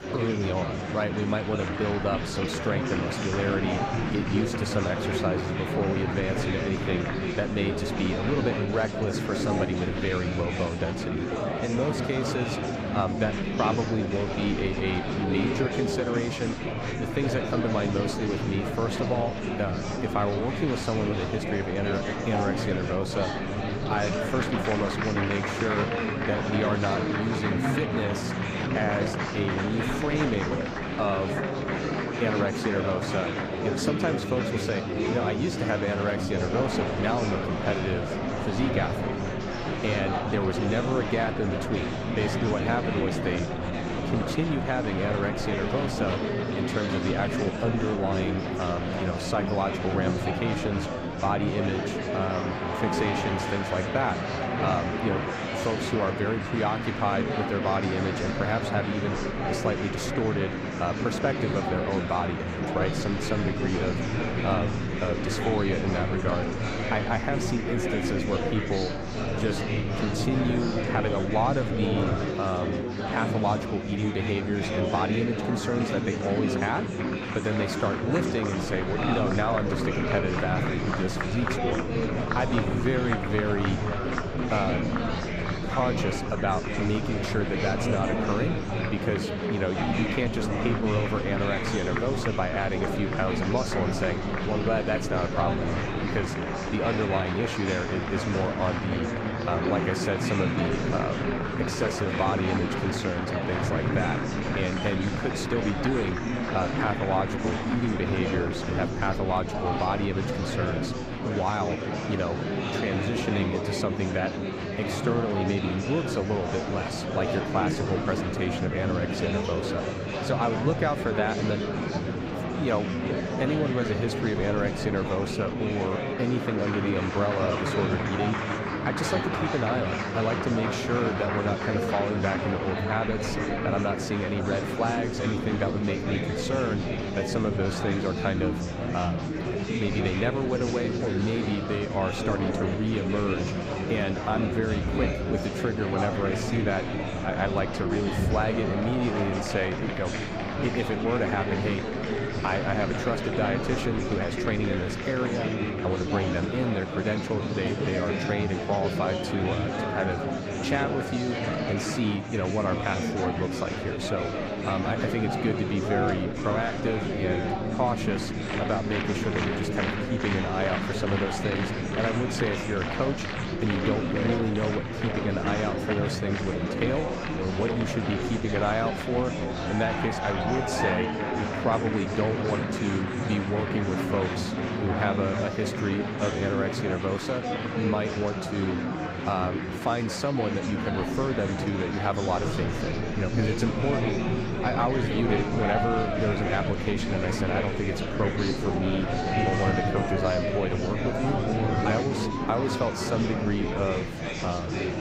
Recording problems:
murmuring crowd; very loud; throughout; as loud as the speech

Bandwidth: 15.5 kHz